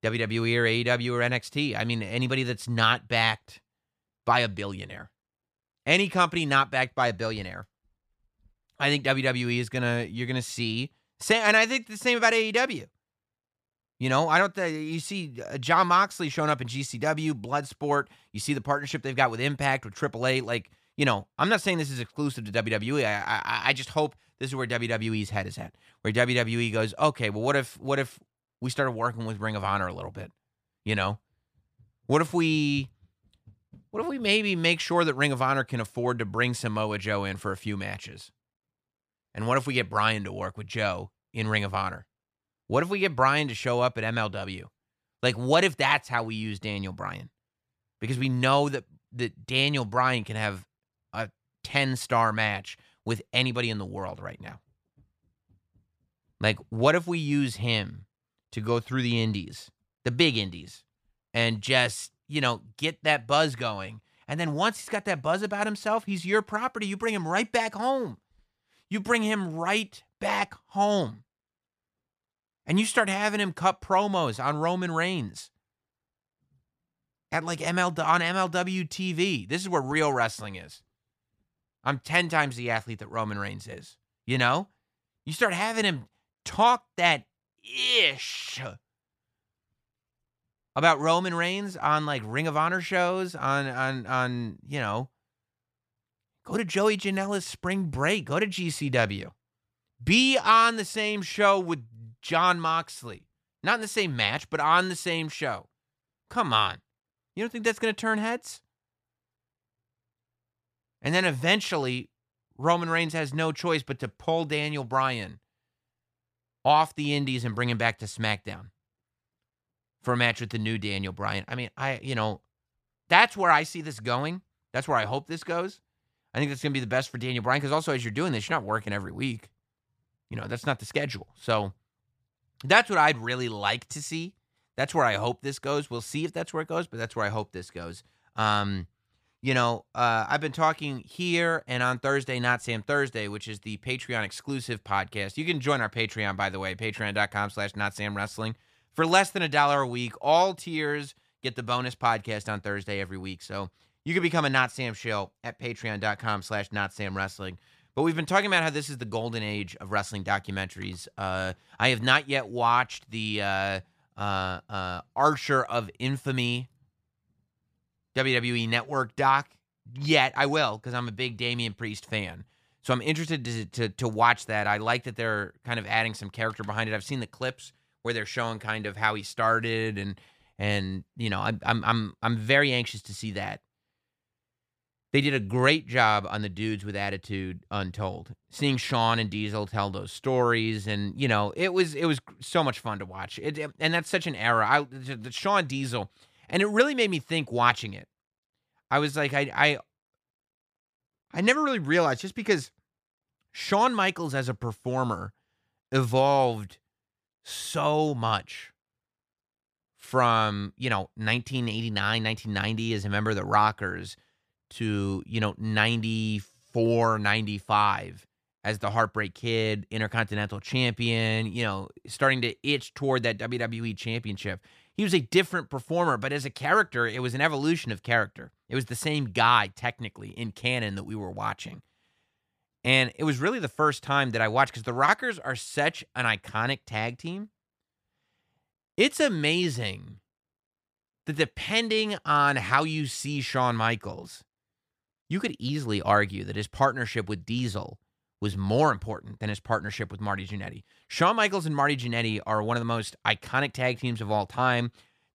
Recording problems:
none

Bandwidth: 14.5 kHz